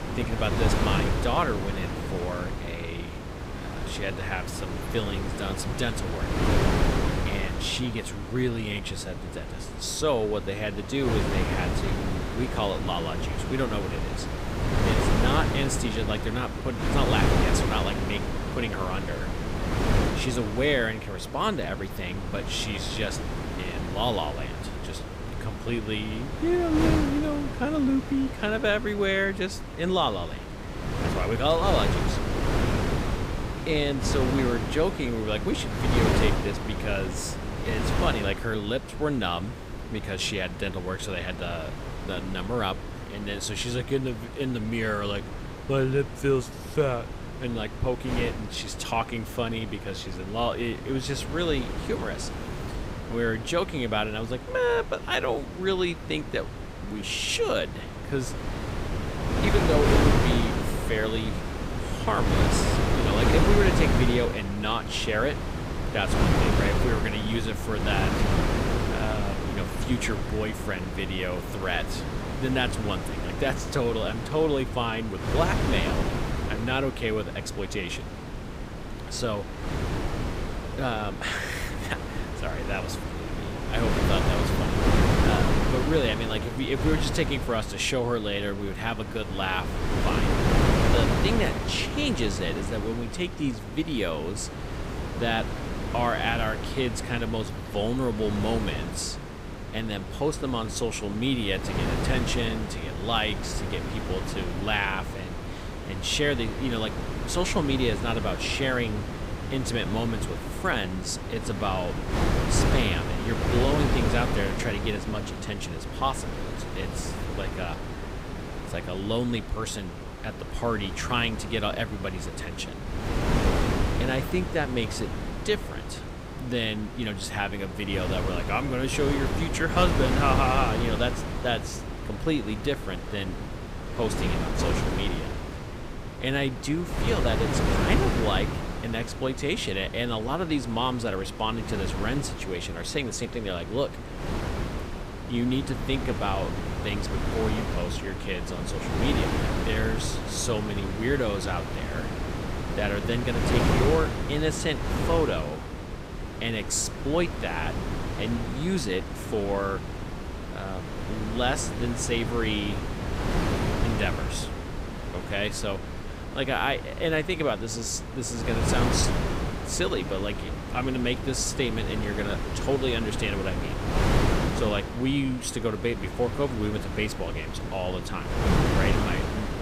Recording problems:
wind noise on the microphone; heavy; 4 dB below the speech

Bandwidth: 15.5 kHz